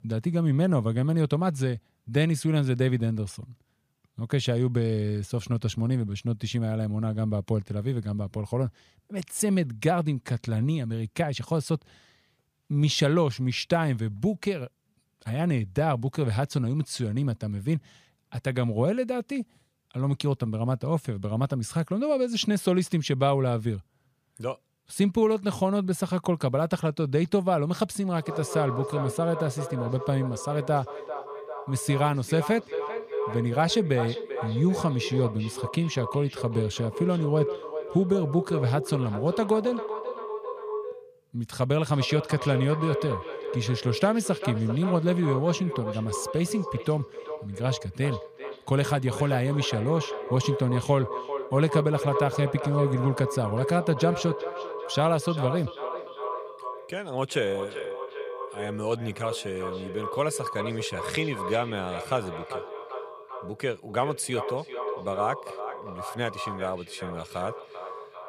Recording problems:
echo of what is said; strong; from 28 s on; 390 ms later, 8 dB below the speech

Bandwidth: 15 kHz